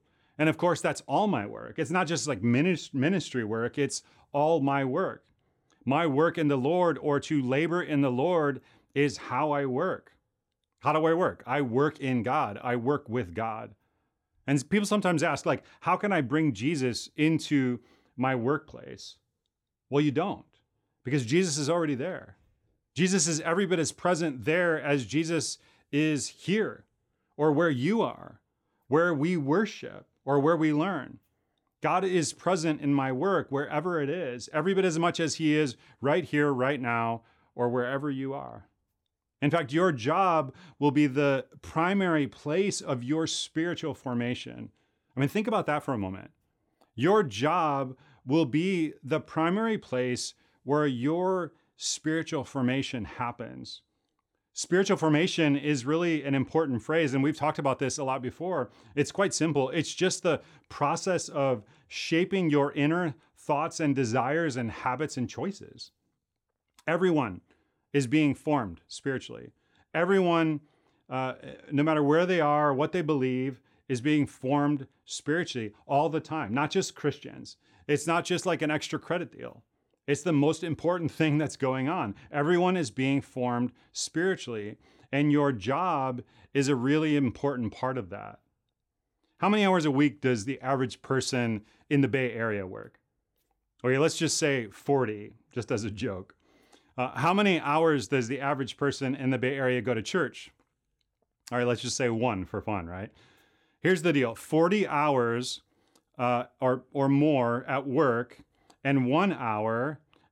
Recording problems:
none

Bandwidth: 17 kHz